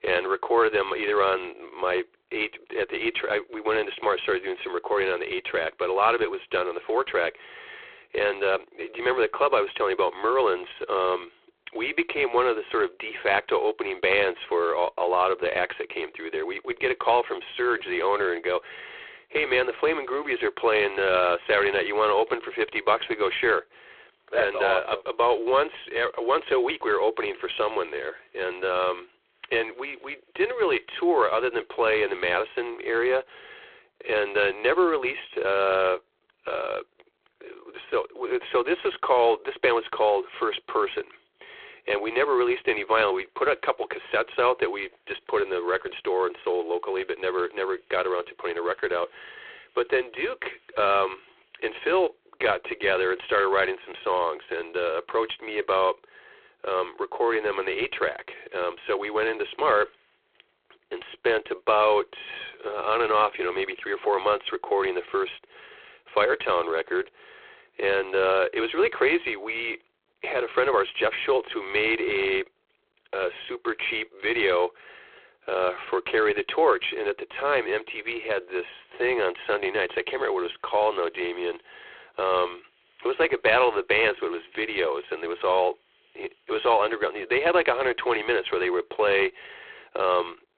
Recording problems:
phone-call audio; poor line

